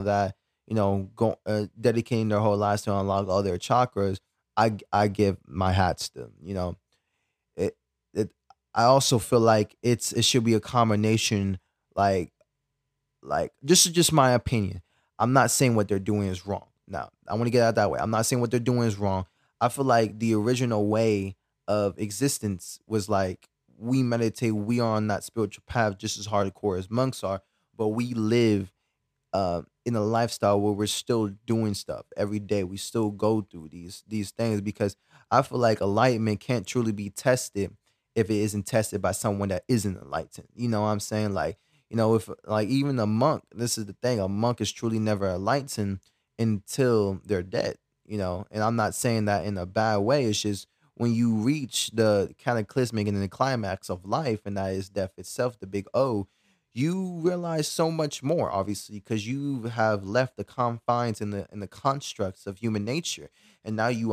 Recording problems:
abrupt cut into speech; at the start and the end

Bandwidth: 14.5 kHz